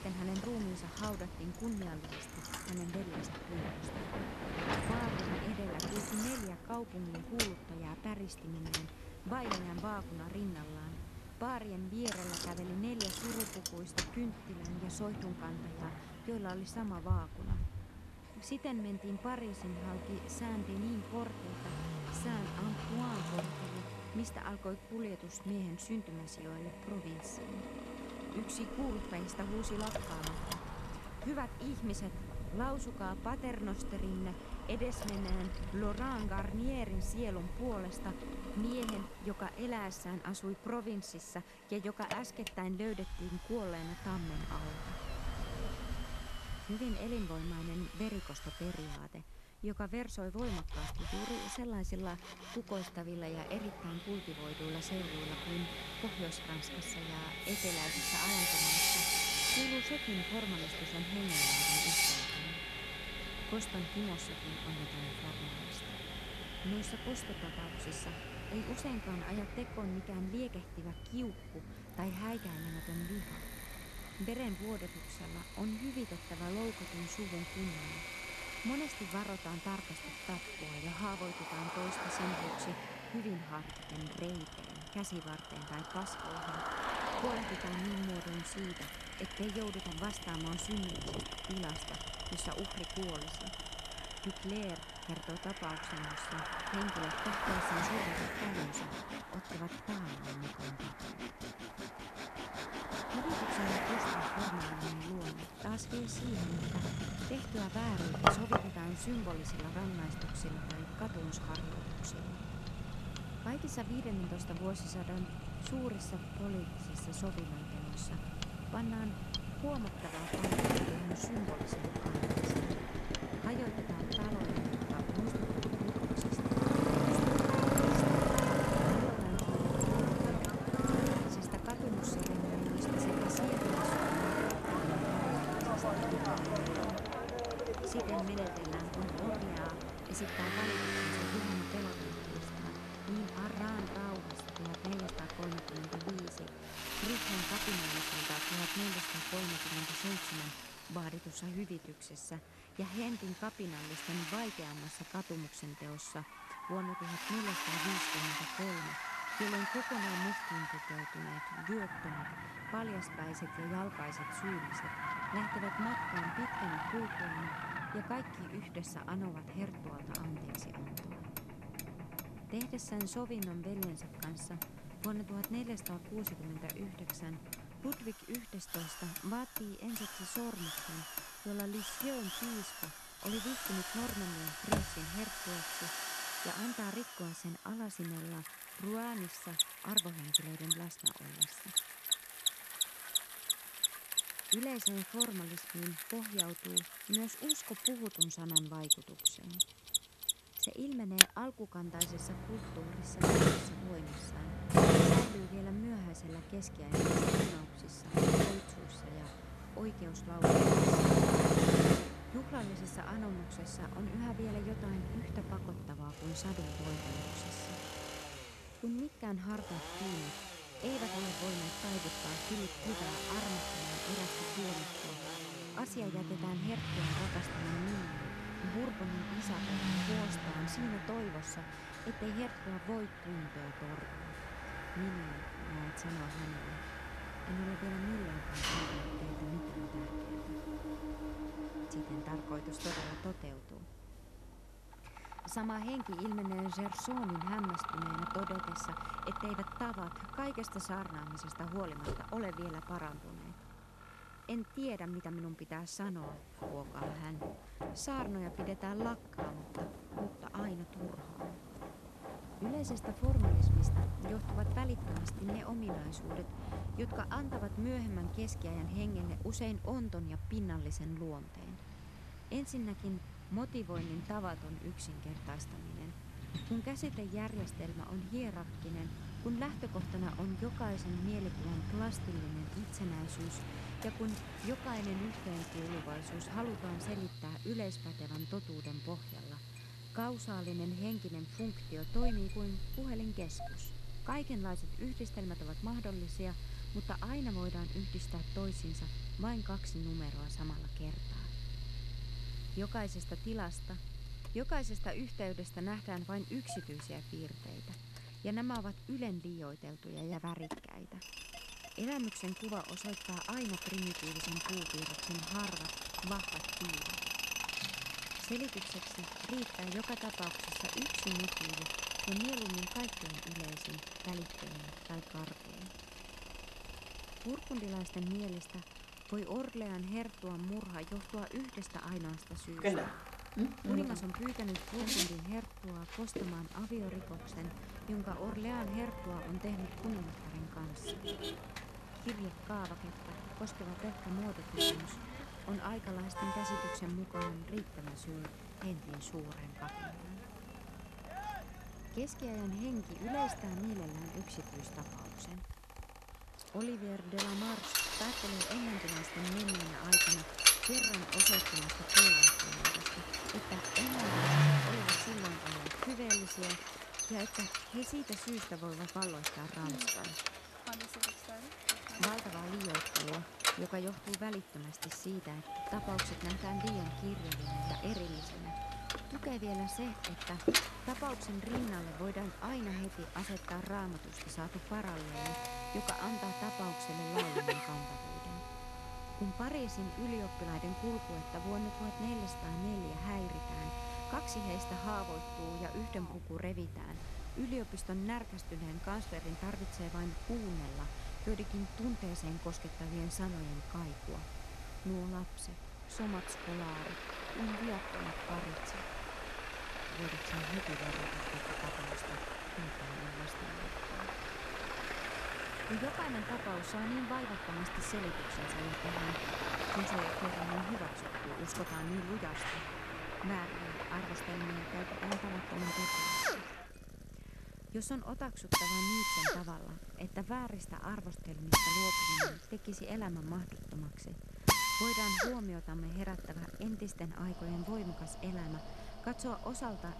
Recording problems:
machinery noise; very loud; throughout; 5 dB above the speech
traffic noise; very loud; throughout; 1 dB above the speech
hiss; faint; throughout; 20 dB below the speech

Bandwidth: 13.5 kHz